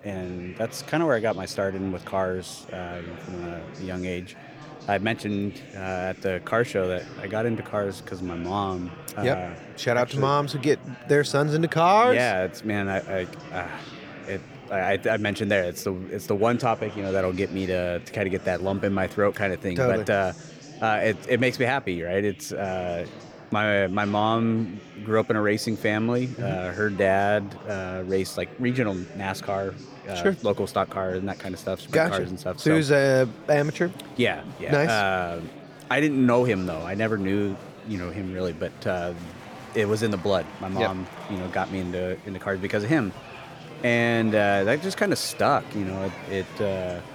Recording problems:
chatter from many people; noticeable; throughout; 15 dB below the speech

